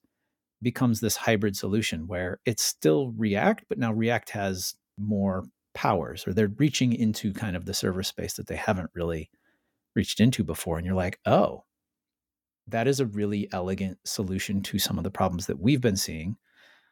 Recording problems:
none

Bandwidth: 17.5 kHz